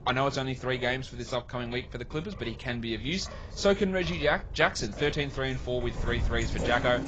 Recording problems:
garbled, watery; badly; nothing above 7.5 kHz
rain or running water; noticeable; throughout; 15 dB below the speech
wind noise on the microphone; occasional gusts; 20 dB below the speech

